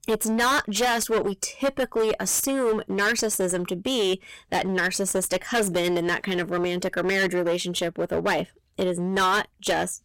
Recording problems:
distortion; heavy; 16% of the sound clipped

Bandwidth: 16 kHz